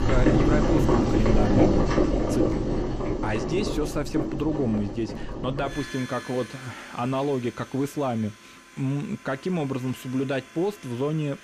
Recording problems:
household noises; very loud; throughout; 3 dB above the speech

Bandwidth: 14 kHz